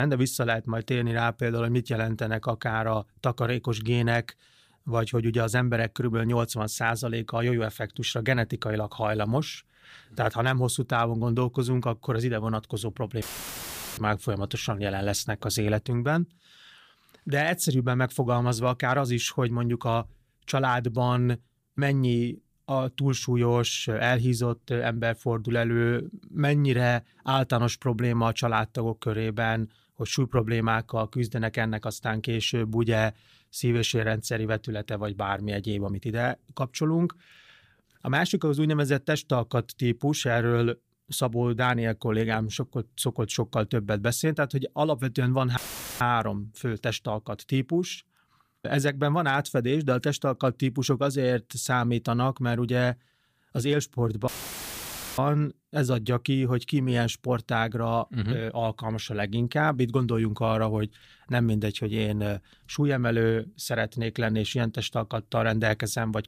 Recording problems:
abrupt cut into speech; at the start
audio cutting out; filled with static; at 13 s for 1 s, at 46 s and at 54 s for 1 s

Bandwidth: 15 kHz